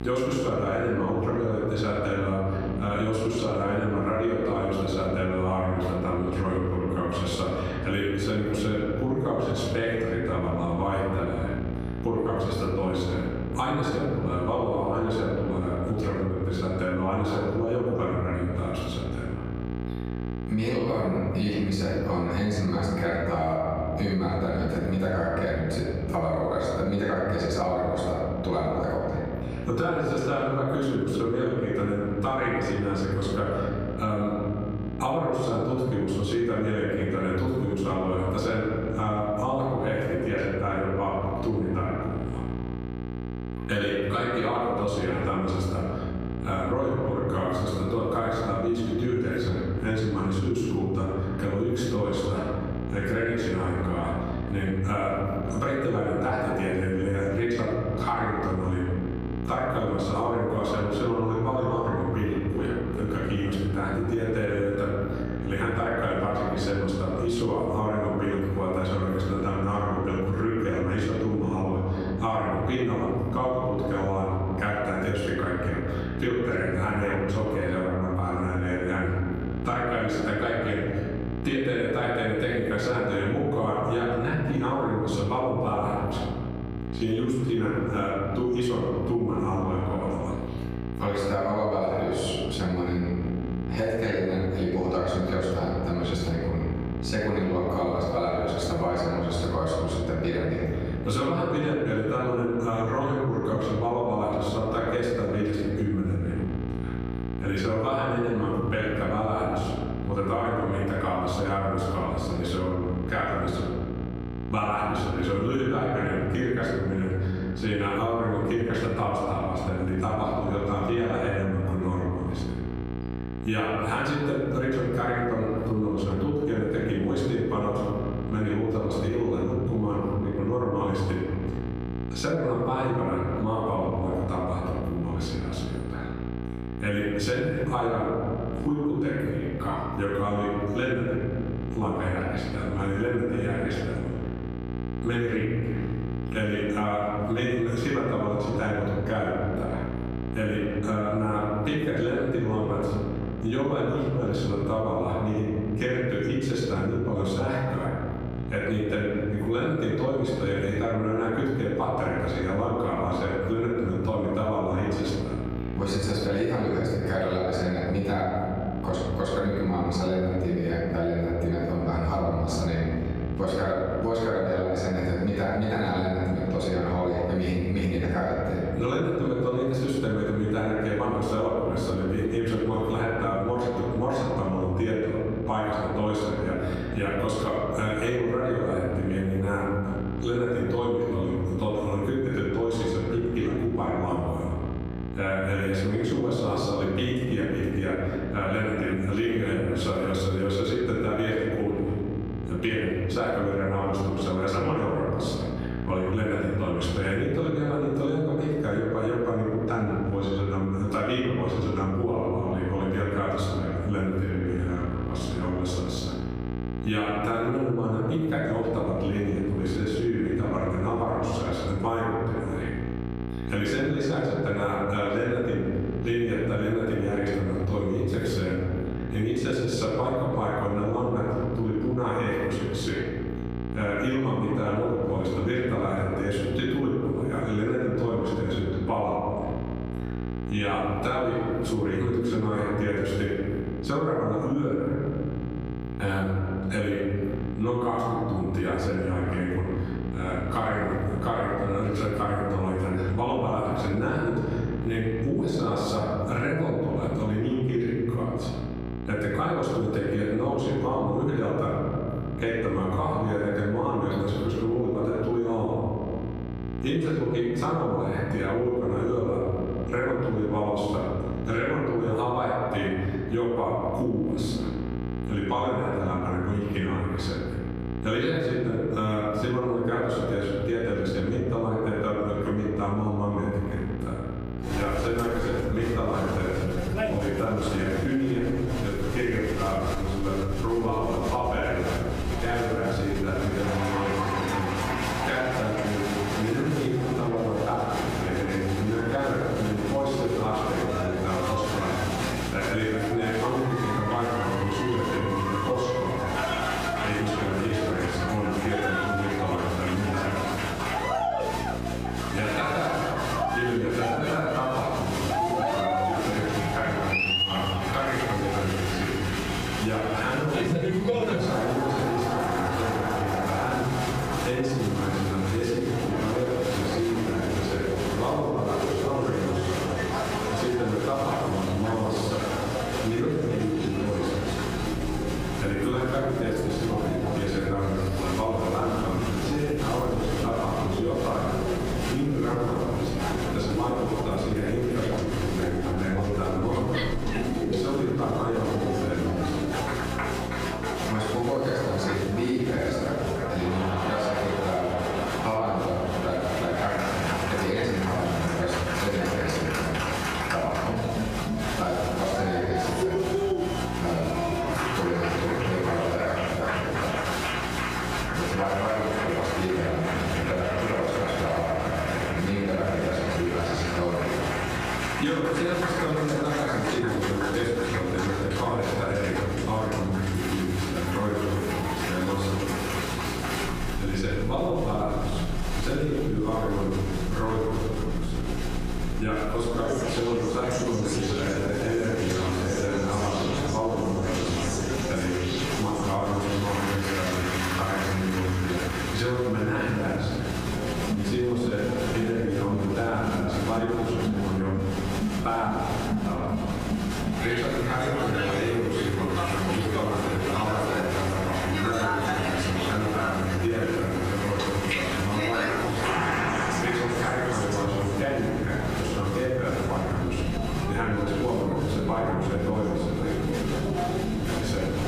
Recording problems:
off-mic speech; far
room echo; noticeable; dies away in 1.6 s
squashed, flat; somewhat
crowd noise; loud; from 4:45 on; 4 dB below the speech
electrical hum; noticeable; throughout; 60 Hz, 15 dB below the speech

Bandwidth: 15 kHz